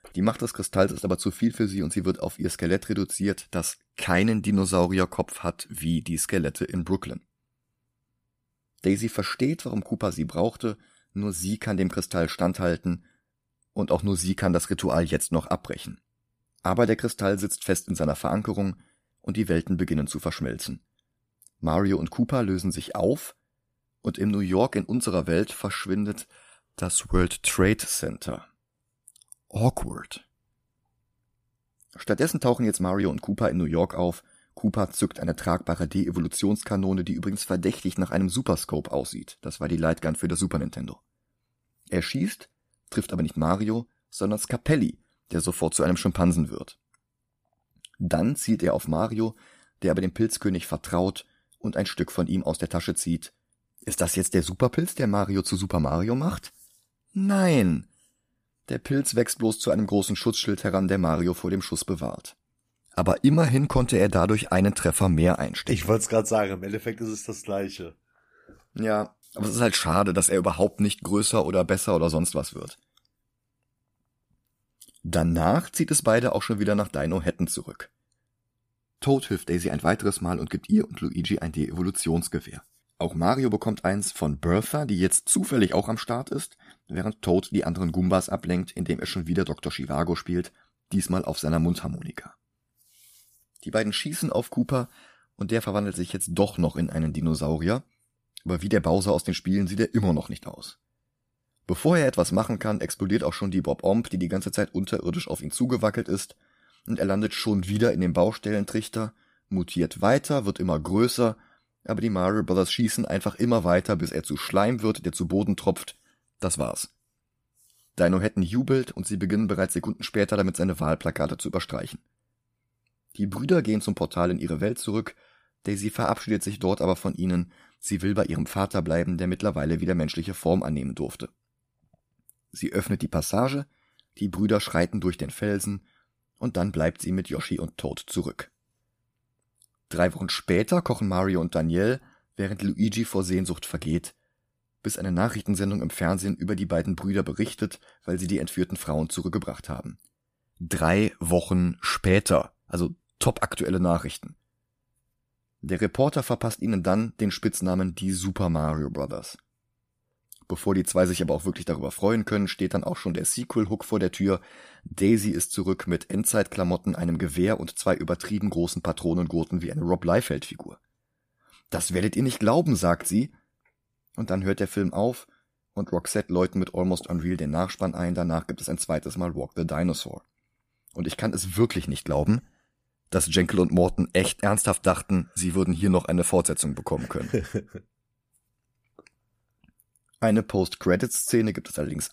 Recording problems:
none

